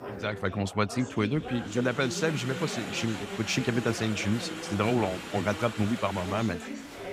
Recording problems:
chatter from many people; loud; throughout; 8 dB below the speech

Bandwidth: 15.5 kHz